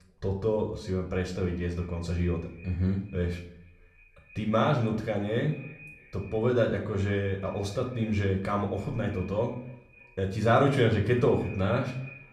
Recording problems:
echo of what is said; faint; throughout; 310 ms later, 25 dB below the speech
room echo; slight; dies away in 0.5 s
off-mic speech; somewhat distant

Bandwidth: 14 kHz